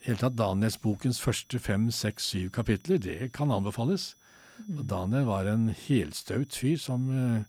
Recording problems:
high-pitched whine; faint; throughout; 6 kHz, 30 dB below the speech

